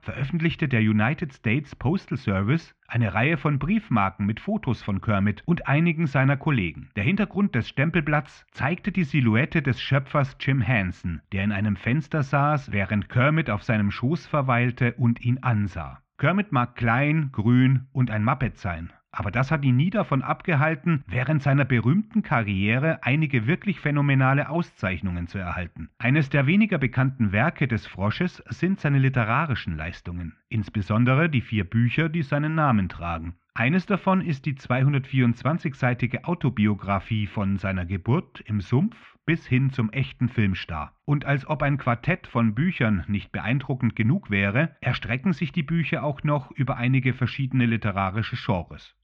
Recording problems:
muffled; very; fading above 3 kHz

